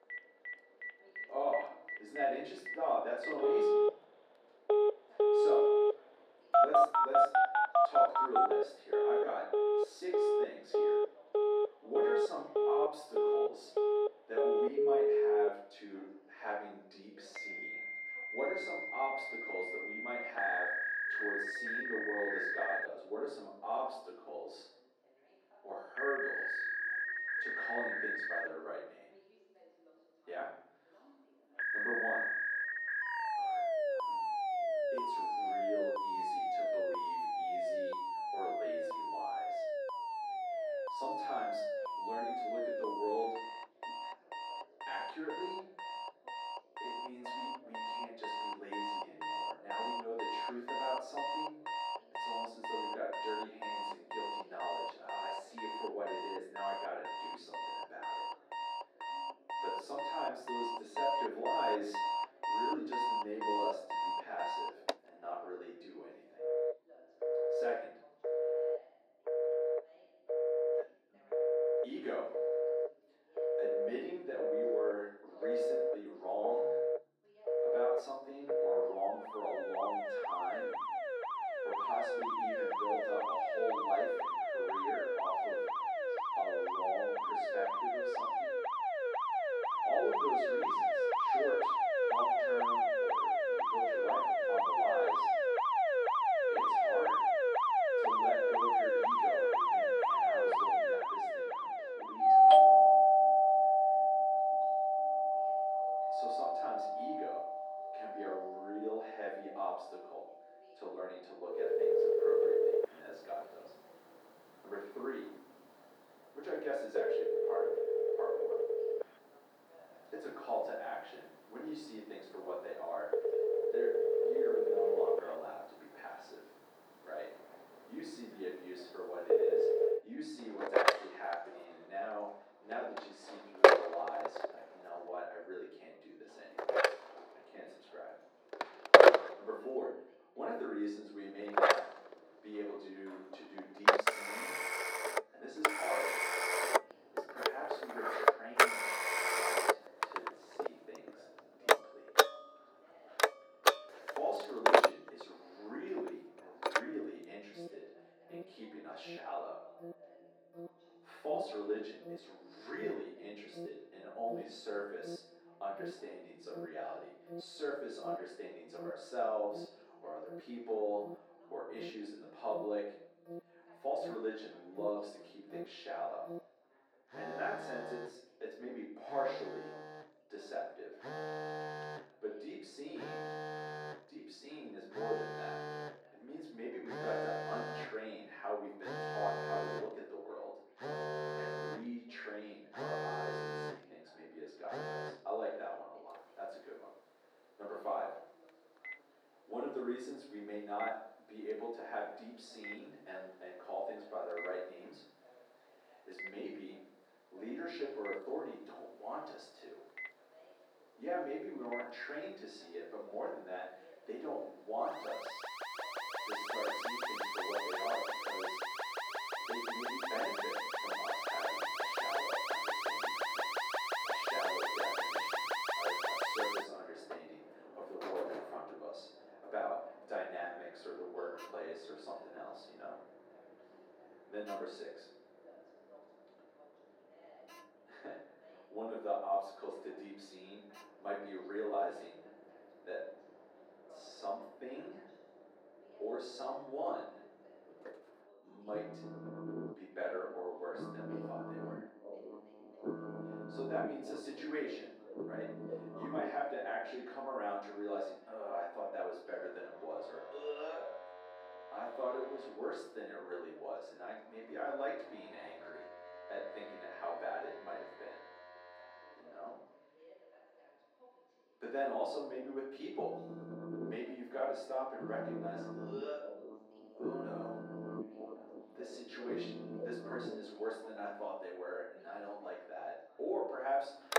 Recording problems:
off-mic speech; far
muffled; very; fading above 2.5 kHz
room echo; noticeable; dies away in 0.7 s
thin; somewhat; fading below 350 Hz
alarms or sirens; very loud; throughout; 9 dB above the speech
voice in the background; faint; throughout; 20 dB below the speech

